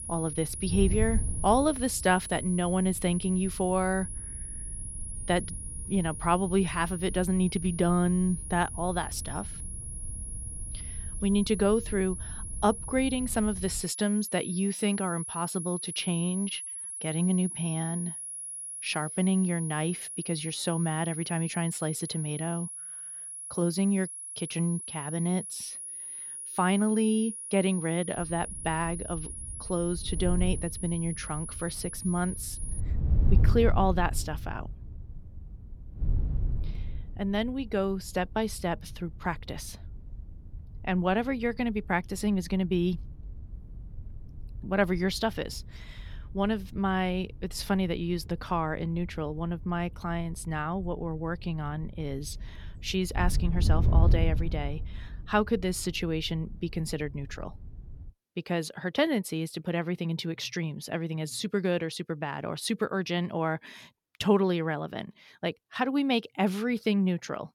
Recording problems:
high-pitched whine; loud; until 33 s; 10.5 kHz, 7 dB below the speech
wind noise on the microphone; occasional gusts; until 14 s and from 28 to 58 s; 20 dB below the speech

